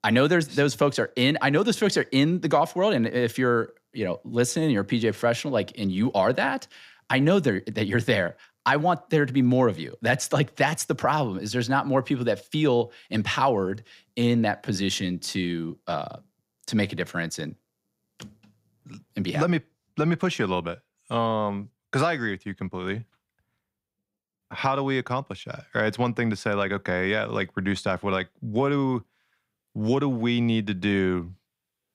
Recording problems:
none

